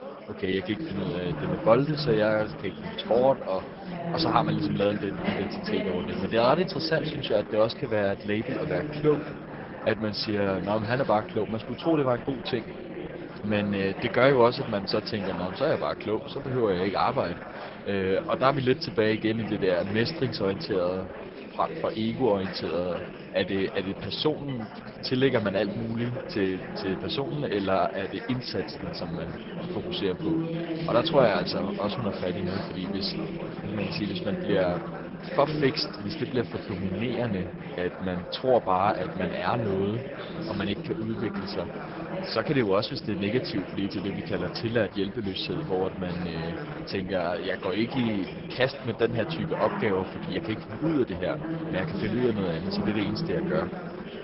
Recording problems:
garbled, watery; badly
high frequencies cut off; noticeable; nothing above 5.5 kHz
chatter from many people; loud; throughout; 7 dB below the speech

